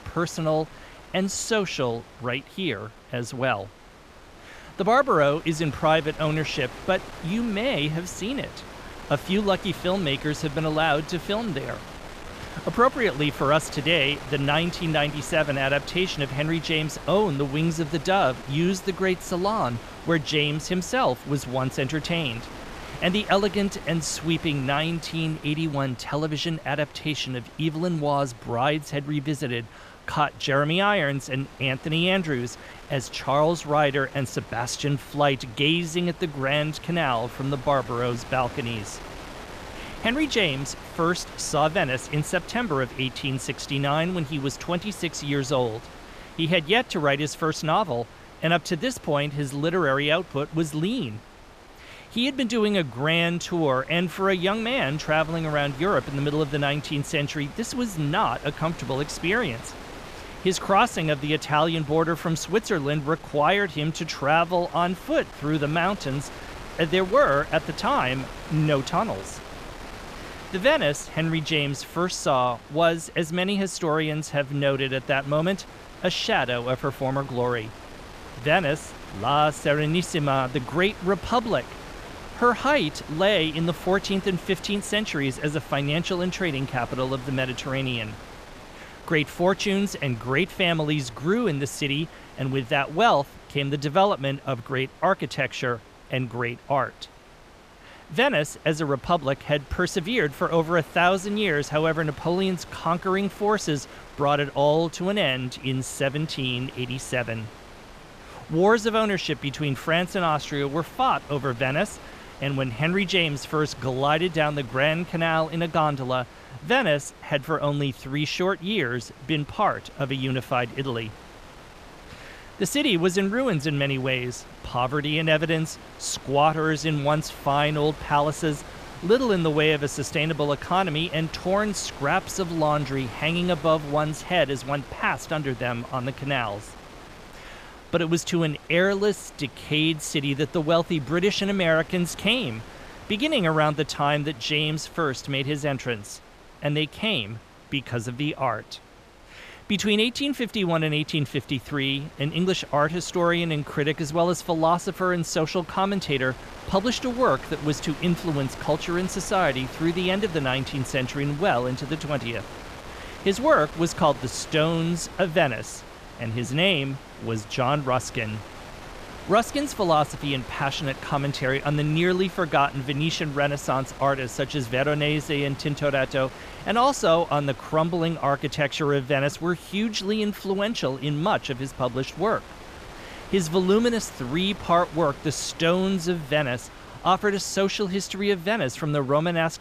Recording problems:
wind noise on the microphone; occasional gusts; 15 dB below the speech

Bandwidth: 14.5 kHz